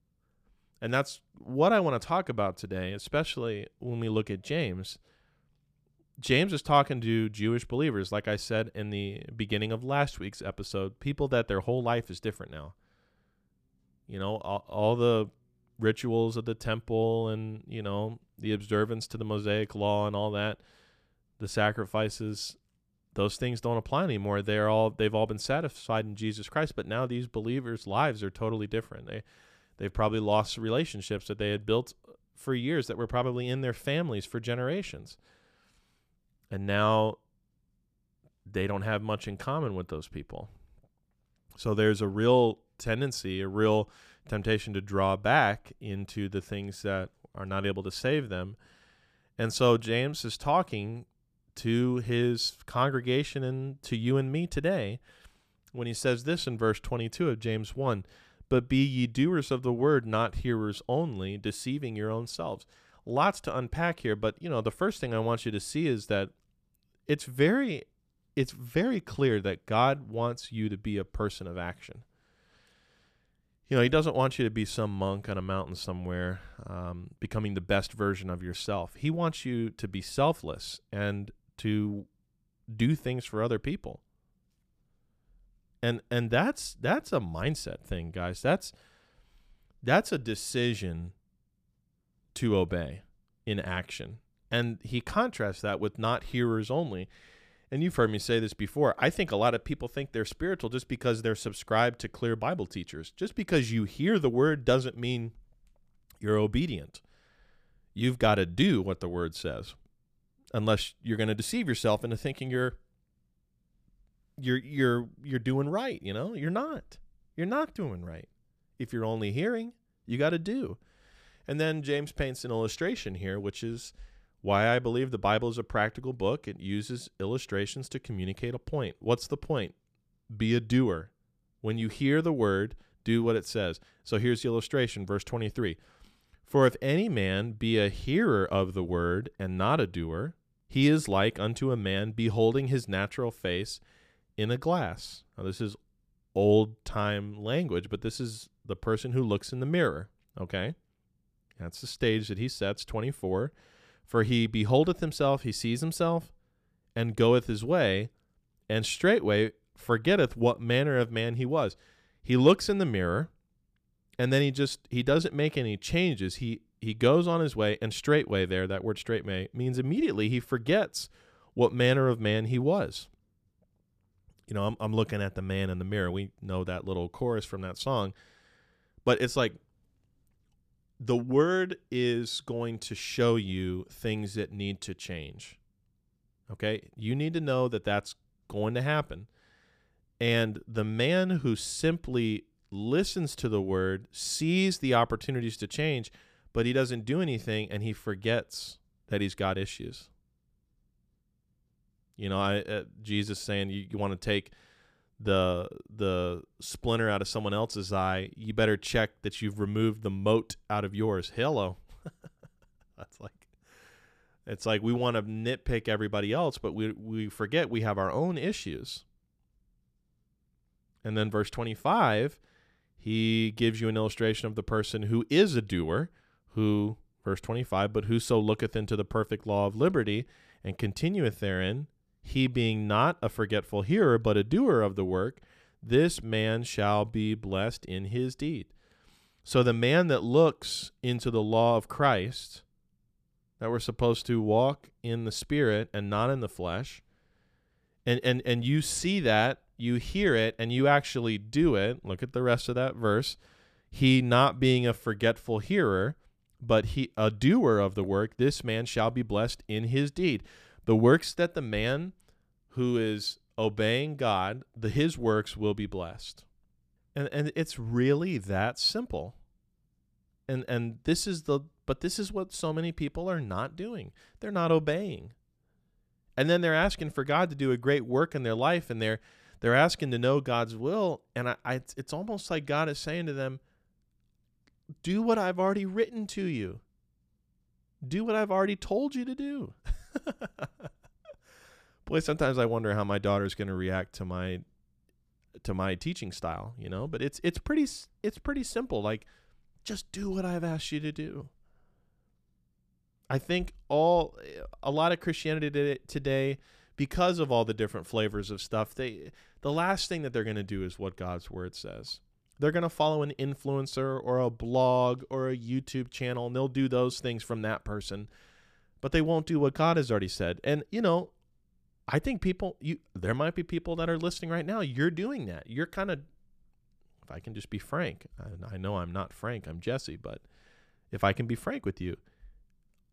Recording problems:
none

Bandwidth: 14.5 kHz